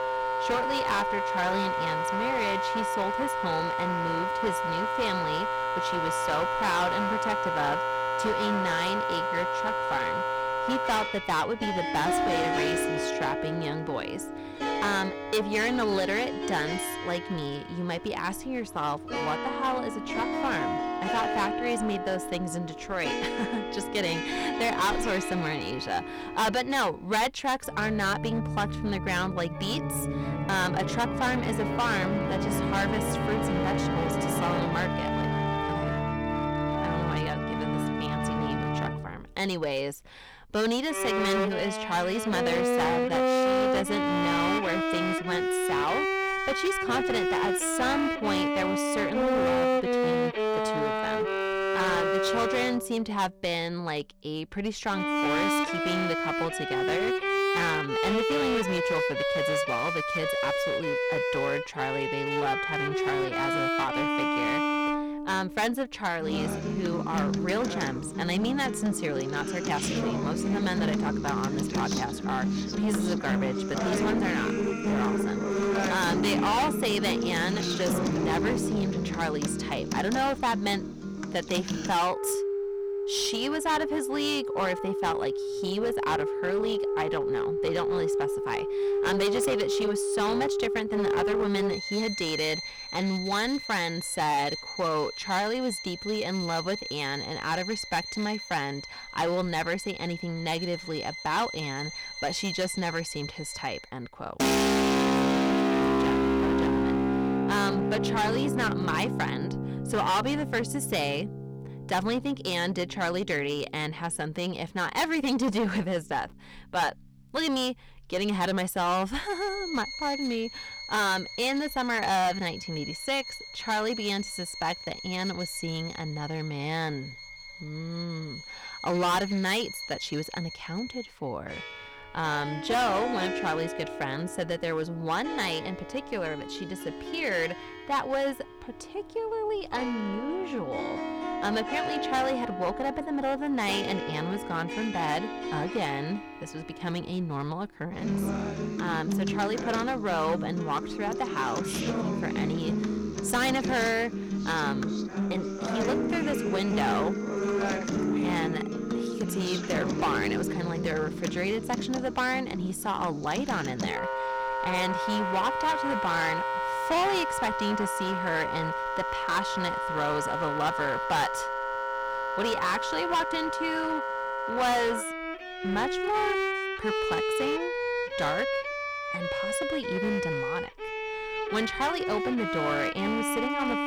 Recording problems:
distortion; heavy; 12% of the sound clipped
background music; very loud; throughout; as loud as the speech

